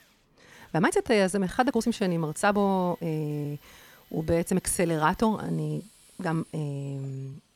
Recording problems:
machinery noise; faint; throughout; 30 dB below the speech
uneven, jittery; strongly; from 0.5 s on

